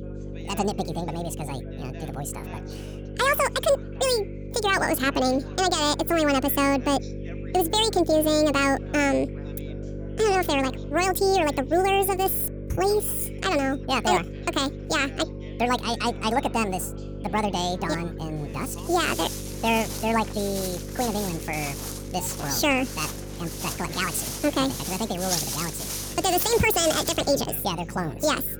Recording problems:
wrong speed and pitch; too fast and too high; 1.7 times normal speed
electrical hum; noticeable; throughout; 50 Hz, 20 dB below the speech
background chatter; faint; throughout; 3 voices, 20 dB below the speech
footsteps; noticeable; from 19 to 27 s; peak 1 dB below the speech

